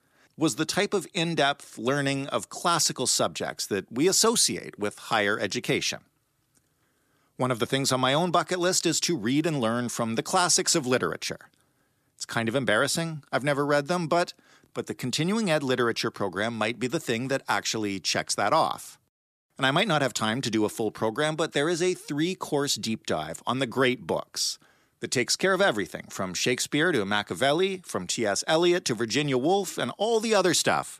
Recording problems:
none

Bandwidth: 14.5 kHz